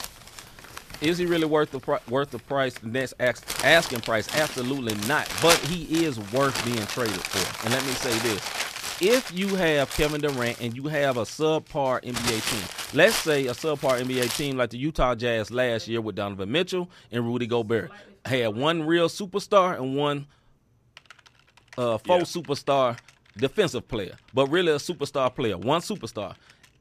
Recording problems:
household noises; loud; throughout; 5 dB below the speech

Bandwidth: 14.5 kHz